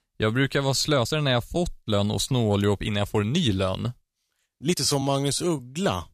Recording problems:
uneven, jittery; strongly; from 0.5 to 5.5 s

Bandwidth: 14.5 kHz